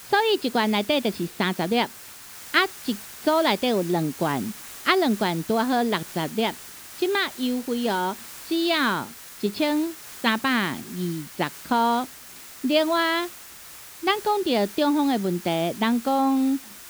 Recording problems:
high frequencies cut off; noticeable; nothing above 5.5 kHz
hiss; noticeable; throughout; 15 dB below the speech

